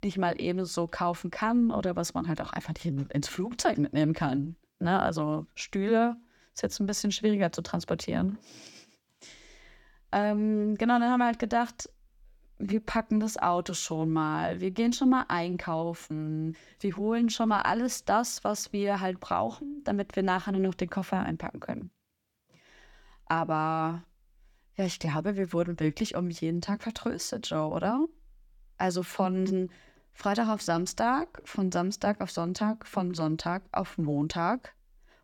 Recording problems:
none

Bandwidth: 18 kHz